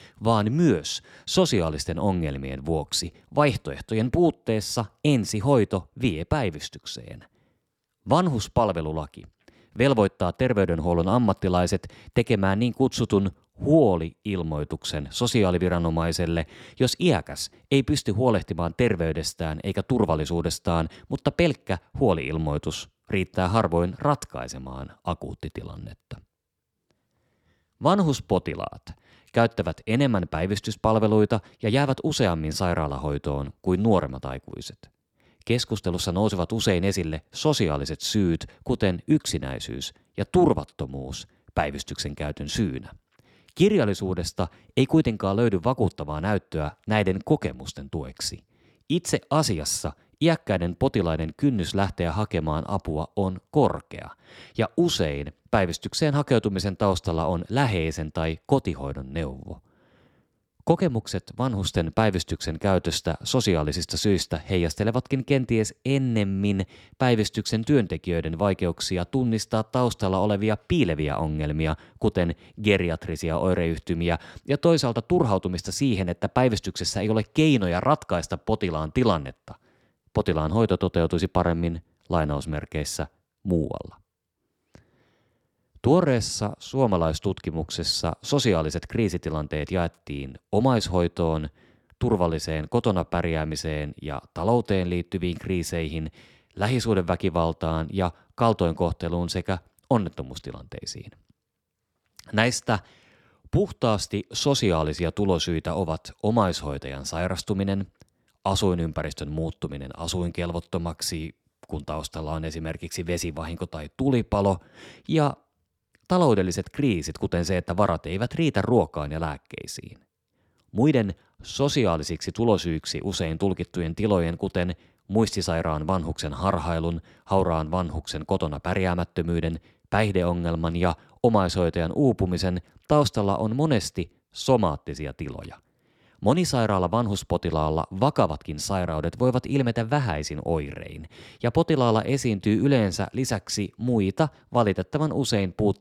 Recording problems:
none

